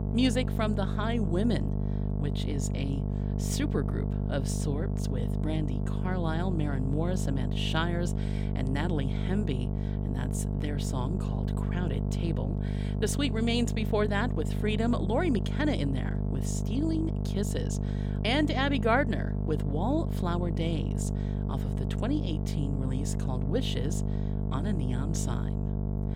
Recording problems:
electrical hum; loud; throughout; 50 Hz, 7 dB below the speech

